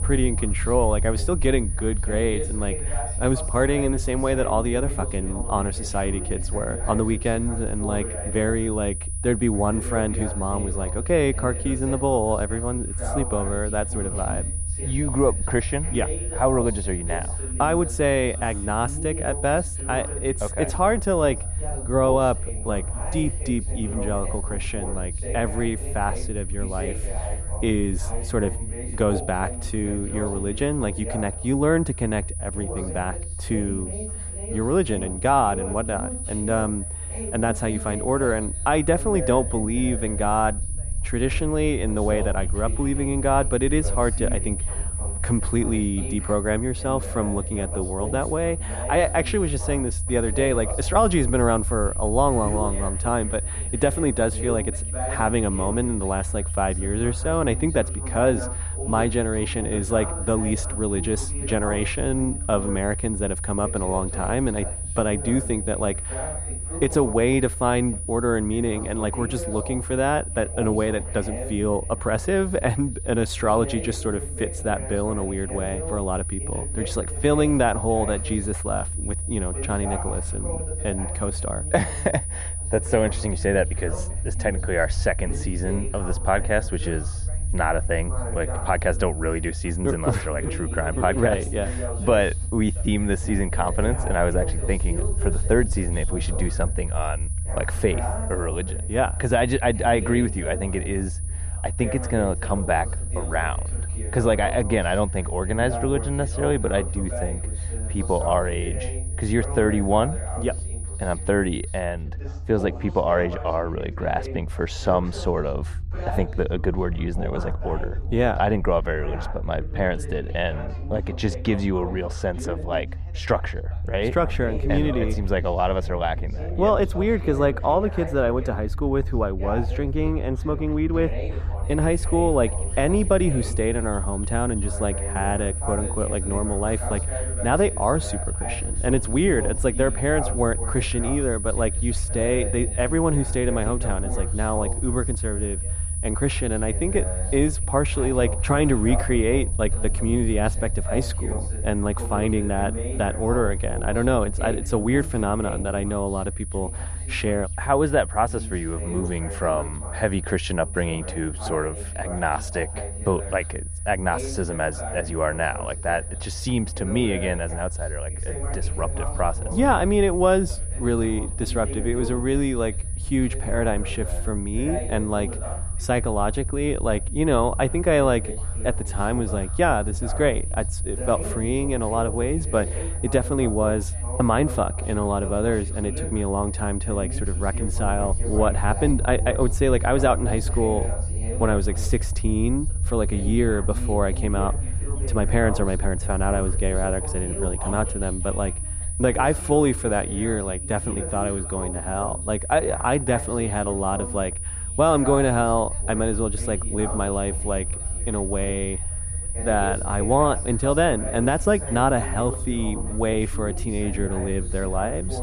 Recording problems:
muffled; slightly; fading above 2 kHz
high-pitched whine; loud; until 1:52 and from 2:12 on; 9.5 kHz, 9 dB below the speech
background chatter; noticeable; throughout; 2 voices, 15 dB below the speech
low rumble; faint; throughout; 25 dB below the speech

